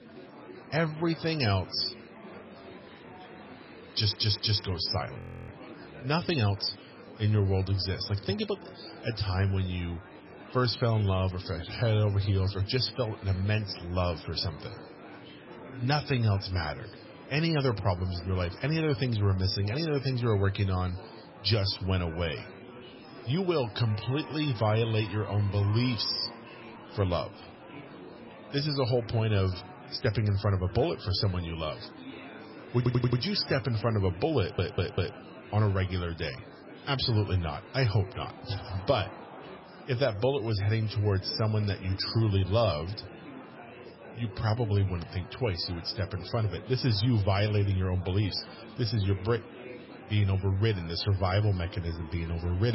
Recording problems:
garbled, watery; badly; nothing above 5.5 kHz
murmuring crowd; noticeable; throughout; 15 dB below the speech
audio stuttering; at 4 s, at 33 s and at 34 s
audio freezing; at 5 s
abrupt cut into speech; at the end

